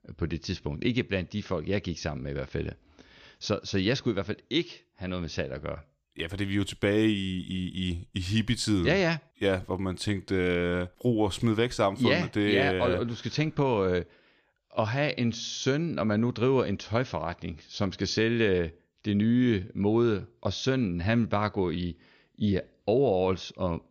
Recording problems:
none

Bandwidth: 15 kHz